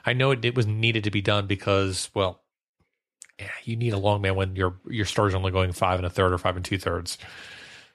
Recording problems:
none

